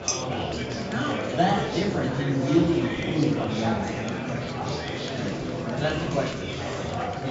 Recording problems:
off-mic speech; far
high frequencies cut off; noticeable; nothing above 7.5 kHz
room echo; slight; dies away in 0.5 s
murmuring crowd; loud; throughout; 2 dB below the speech
background music; faint; throughout; 20 dB below the speech
clattering dishes; noticeable; at the start; peak 1 dB below the speech
clattering dishes; faint; at 6.5 s; peak 15 dB below the speech

